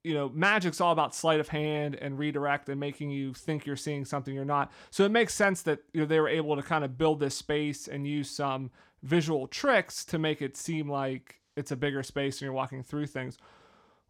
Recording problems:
none

